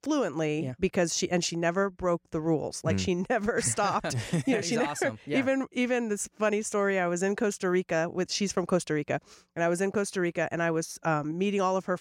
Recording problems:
none

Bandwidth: 16 kHz